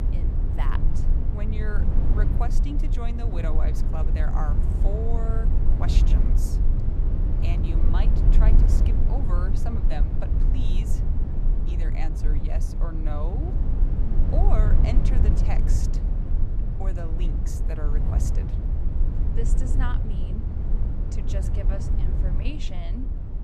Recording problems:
low rumble; loud; throughout; 2 dB below the speech

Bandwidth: 14.5 kHz